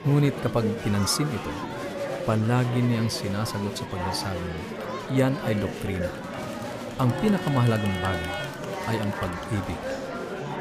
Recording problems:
murmuring crowd; loud; throughout; 6 dB below the speech

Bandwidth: 14.5 kHz